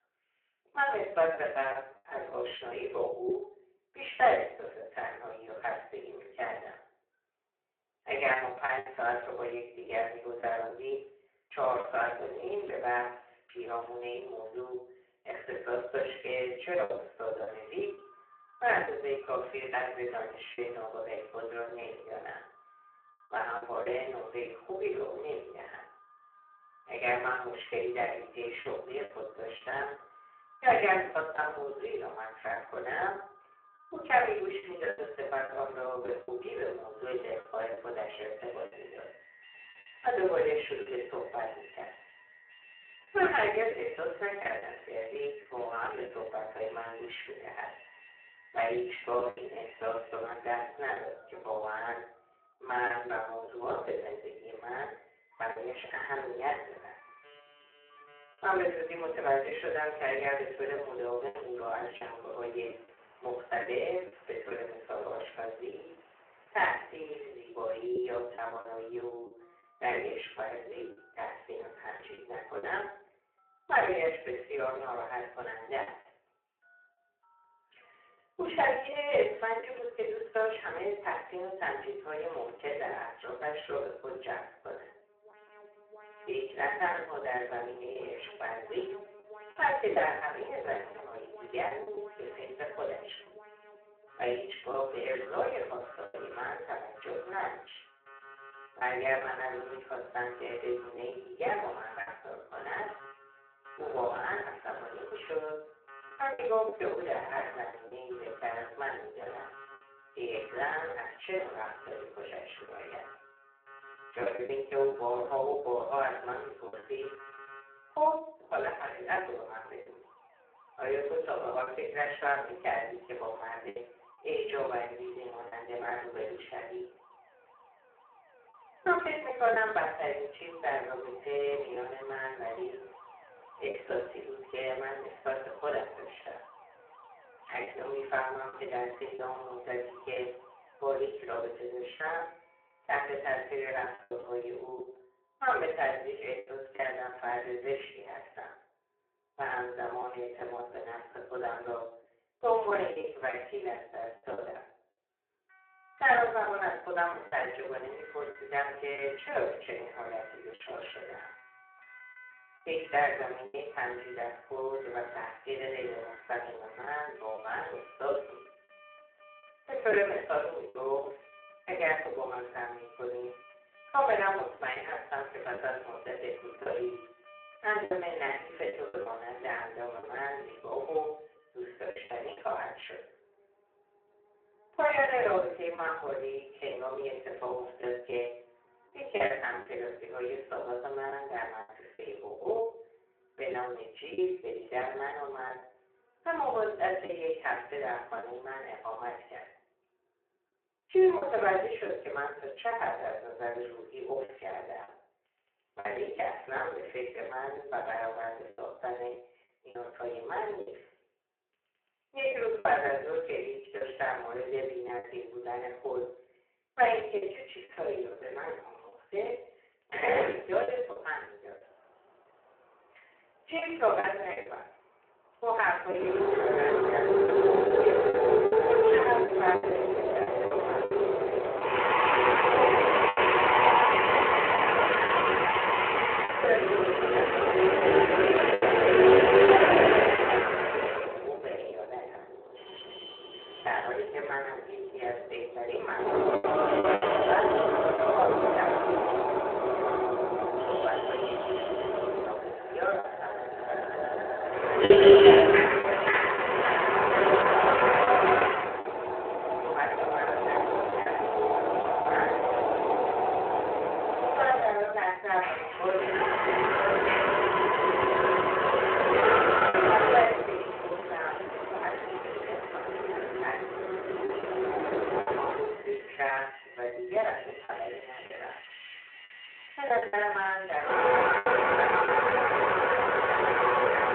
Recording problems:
phone-call audio; poor line
off-mic speech; far
room echo; slight; dies away in 0.4 s
traffic noise; very loud; from 3:46 on; 10 dB above the speech
alarms or sirens; noticeable; throughout; 20 dB below the speech
choppy; occasionally; 4% of the speech affected

